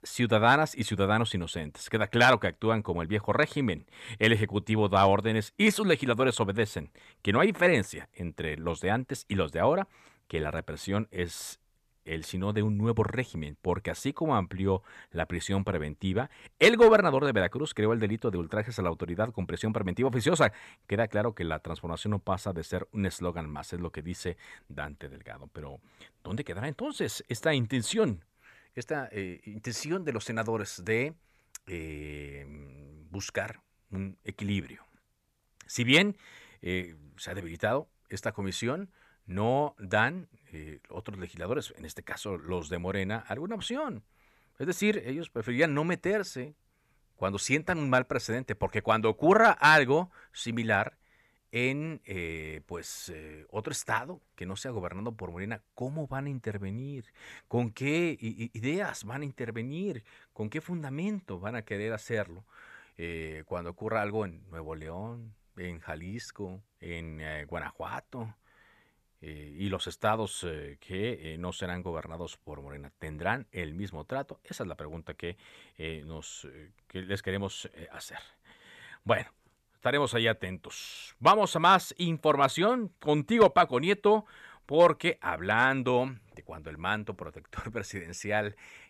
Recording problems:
none

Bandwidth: 14.5 kHz